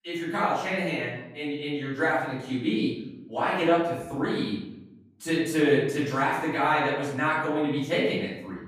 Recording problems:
off-mic speech; far
room echo; noticeable; dies away in 0.8 s

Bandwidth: 15 kHz